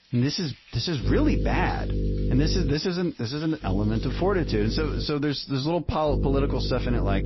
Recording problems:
garbled, watery; slightly; nothing above 5.5 kHz
electrical hum; loud; from 1 to 2.5 s, from 3.5 to 5 s and from 6 s on; 50 Hz, 10 dB below the speech
rain or running water; faint; throughout; 25 dB below the speech

